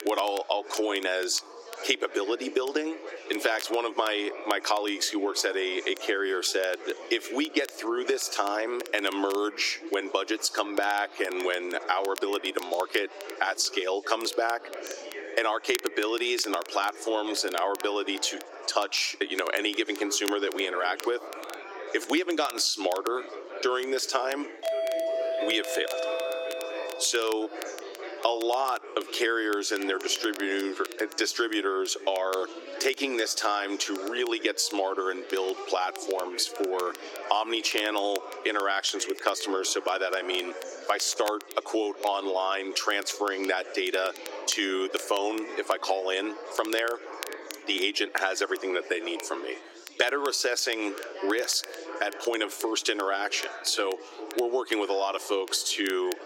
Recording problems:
thin; somewhat; fading below 300 Hz
squashed, flat; somewhat, background pumping
chatter from many people; noticeable; throughout; 15 dB below the speech
crackle, like an old record; noticeable; 15 dB below the speech
doorbell; noticeable; from 25 to 27 s; peak level with the speech

